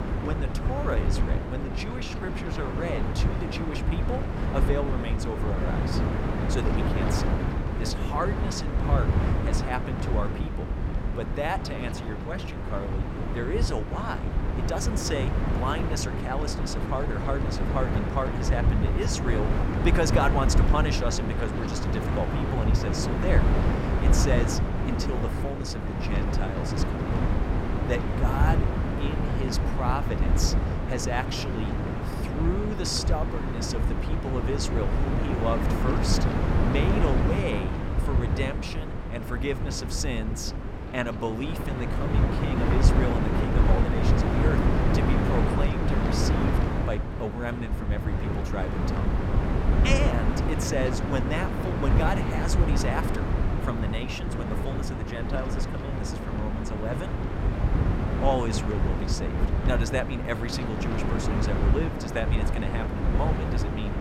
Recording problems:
wind noise on the microphone; heavy; as loud as the speech
phone ringing; faint; at 57 s; peak 15 dB below the speech

